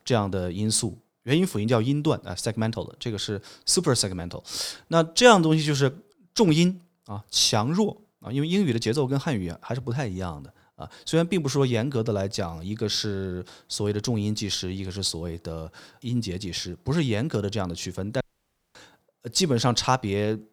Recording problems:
audio cutting out; at 18 s for 0.5 s

